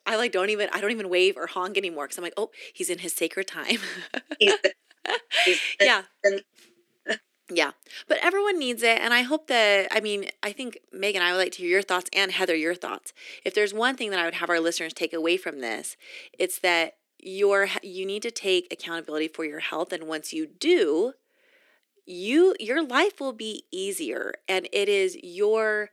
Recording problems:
thin; somewhat; fading below 300 Hz

